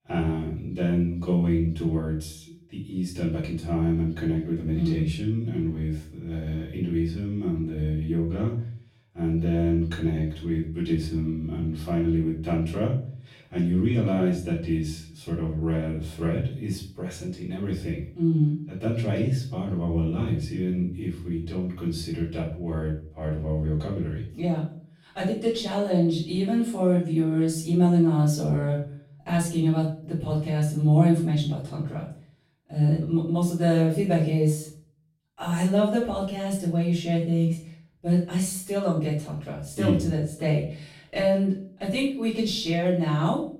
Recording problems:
off-mic speech; far
room echo; noticeable; dies away in 0.4 s

